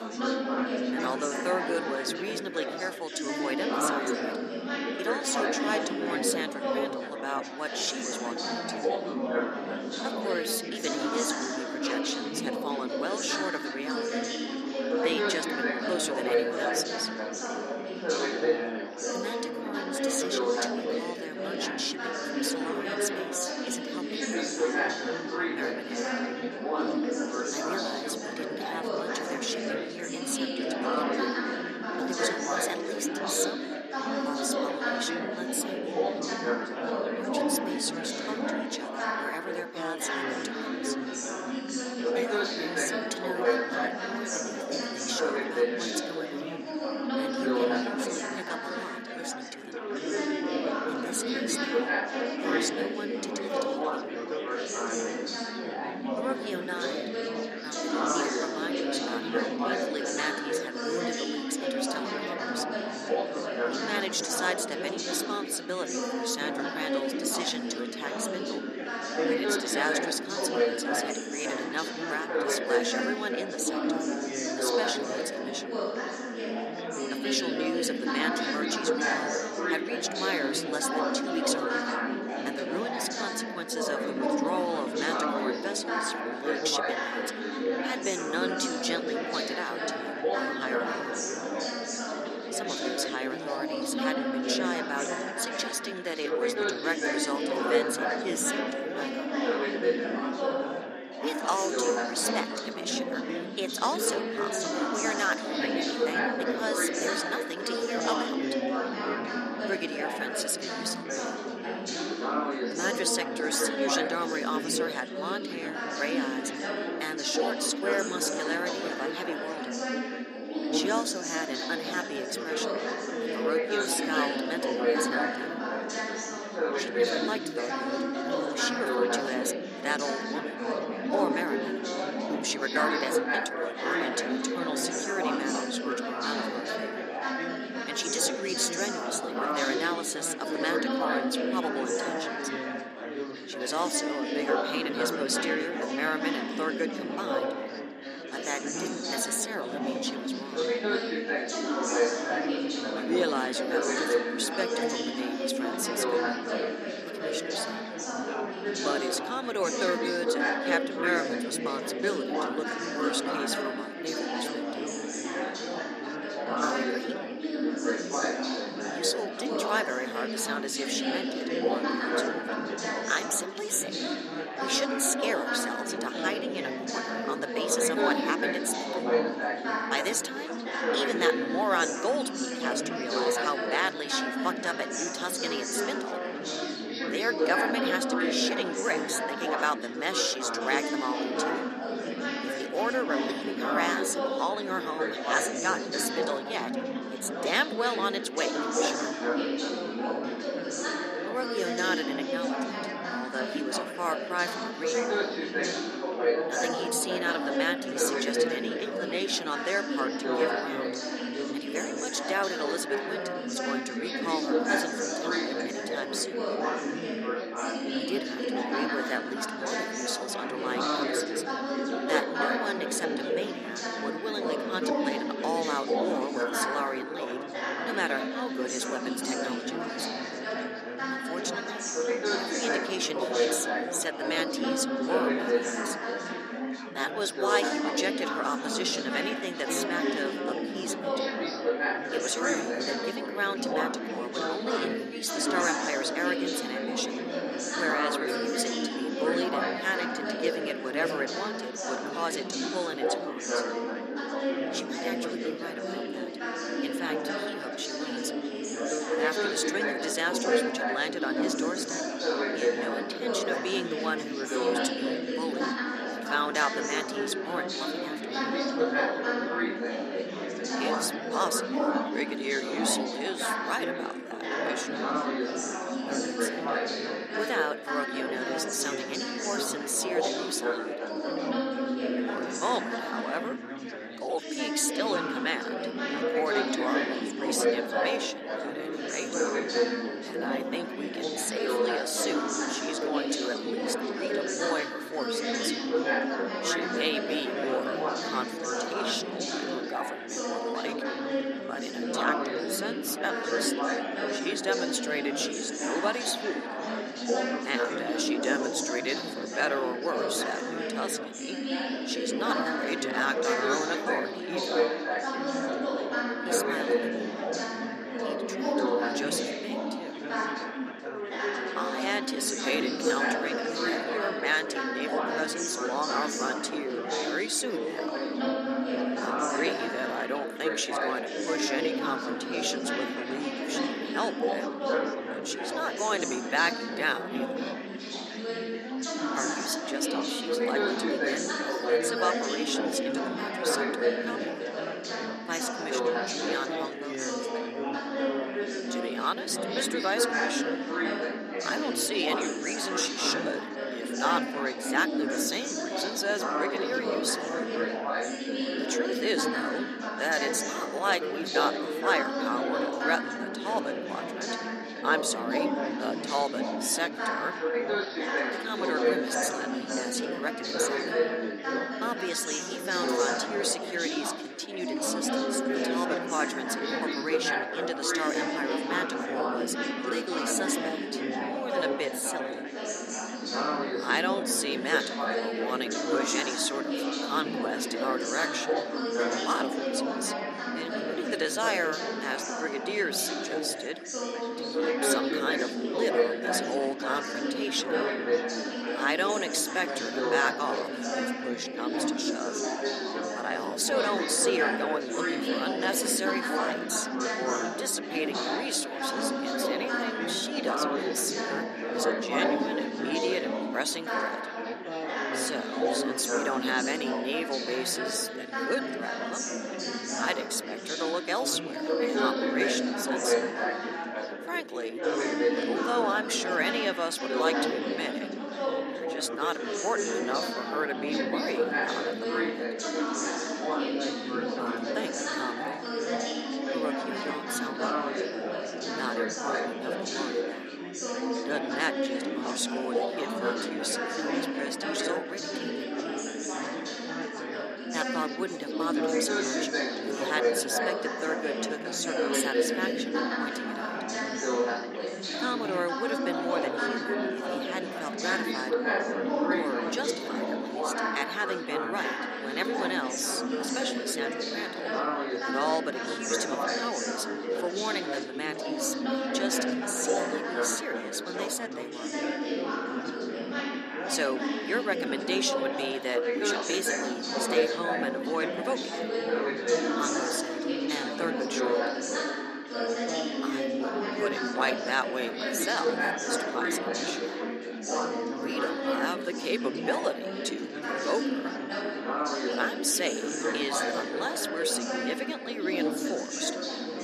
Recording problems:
thin; somewhat; fading below 250 Hz
echo of what is said; faint; throughout; 300 ms later, 20 dB below the speech
chatter from many people; very loud; throughout; 2 dB above the speech

